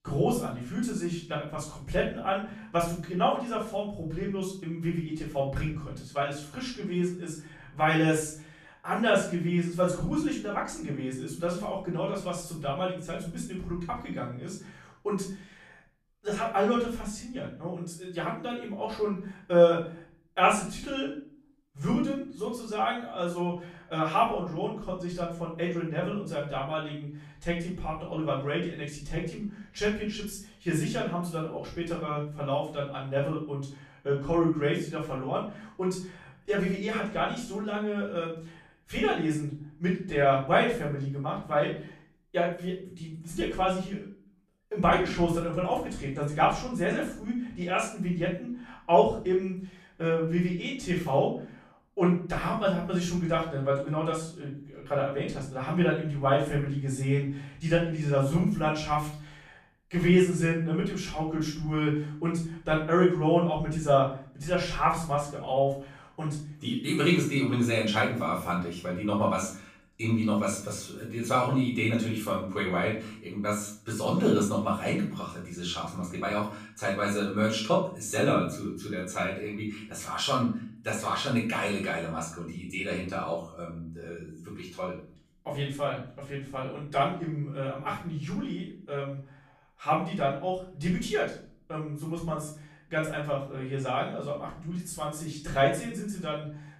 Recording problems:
off-mic speech; far
room echo; noticeable; dies away in 0.4 s

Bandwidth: 14.5 kHz